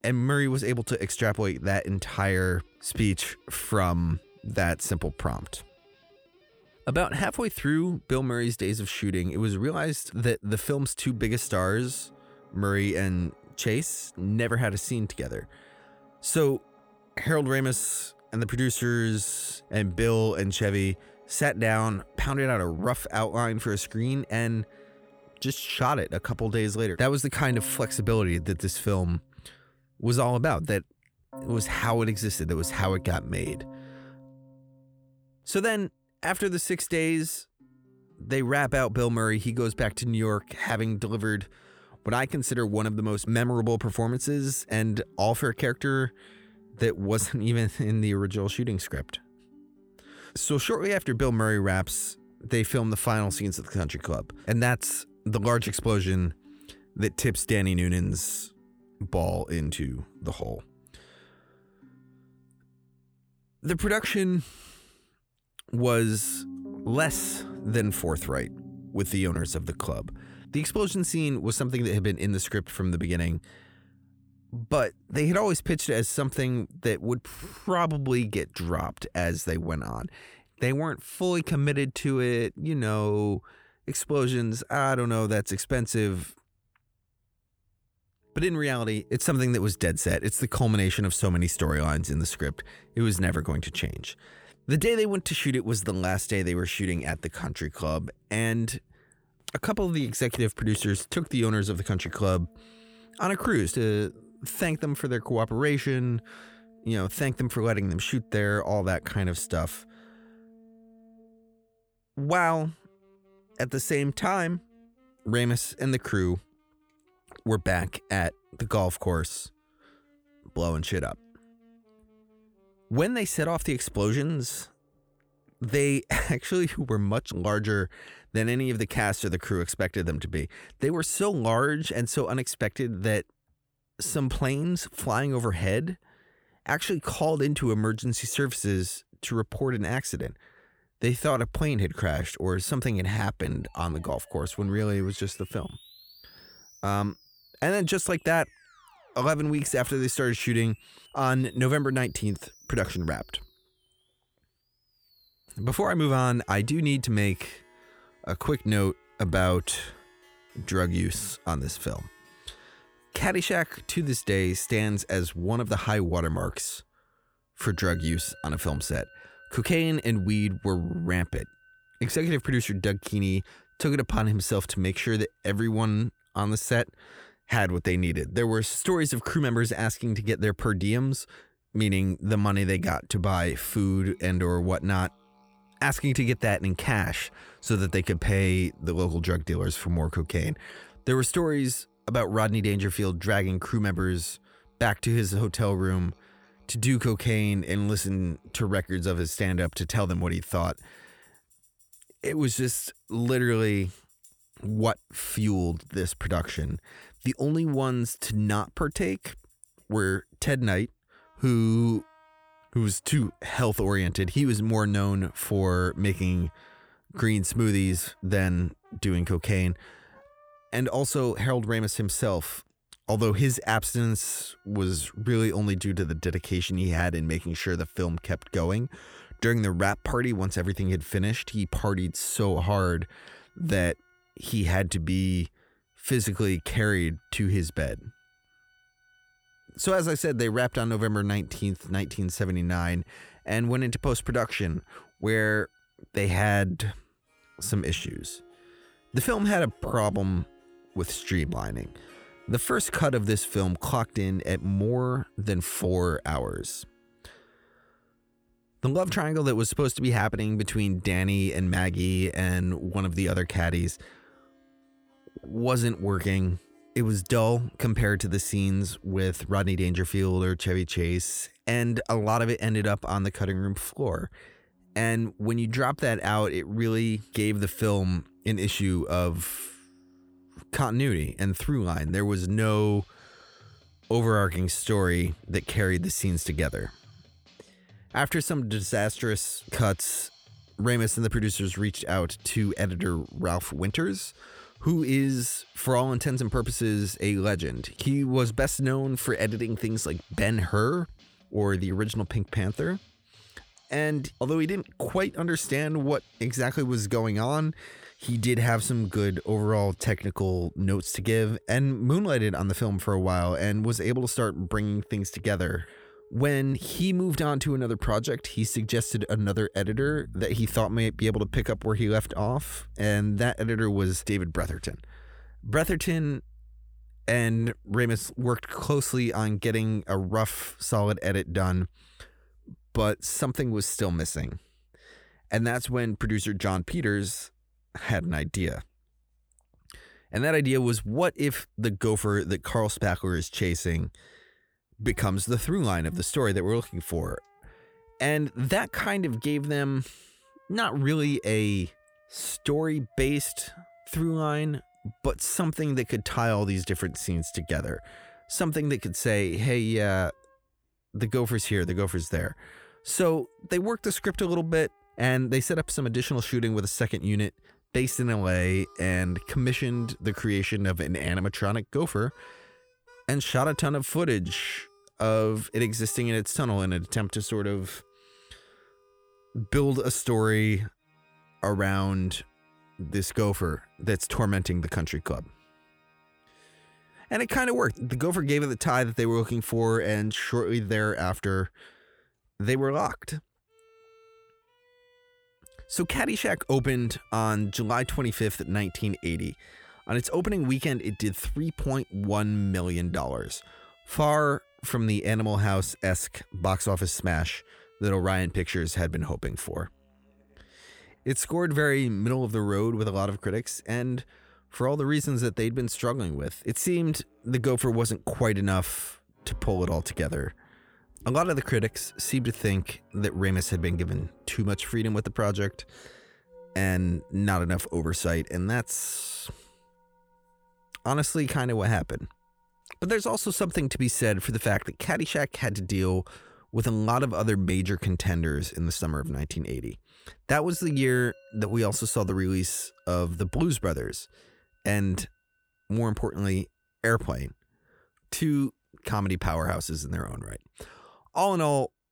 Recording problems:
background music; faint; throughout; 25 dB below the speech

